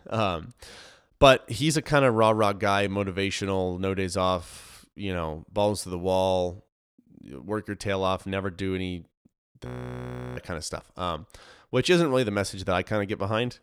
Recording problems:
audio freezing; at 9.5 s for 0.5 s

